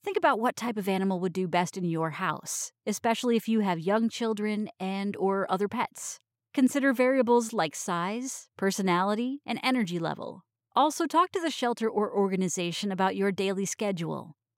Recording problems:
none

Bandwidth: 16 kHz